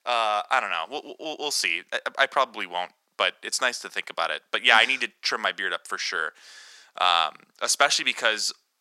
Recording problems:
thin; very; fading below 950 Hz

